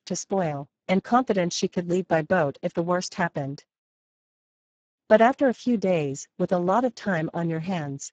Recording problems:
garbled, watery; badly

